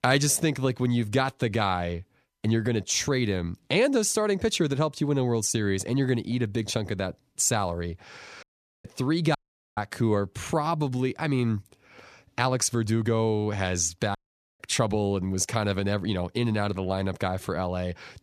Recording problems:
audio cutting out; at 8.5 s, at 9.5 s and at 14 s

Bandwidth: 14.5 kHz